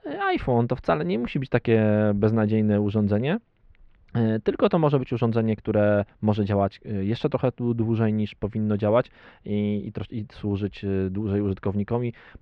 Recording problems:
muffled; slightly; fading above 3 kHz

